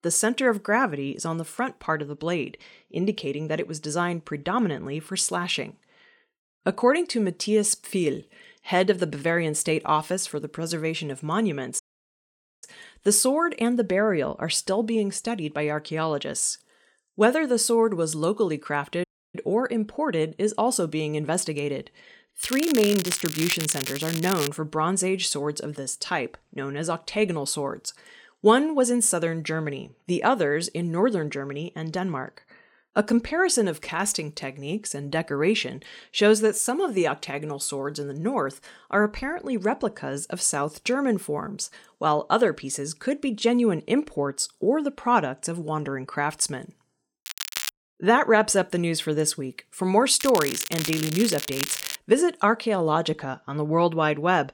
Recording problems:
crackling; loud; from 22 to 24 s, at 47 s and from 50 to 52 s; 6 dB below the speech
audio cutting out; at 12 s for 1 s and at 19 s

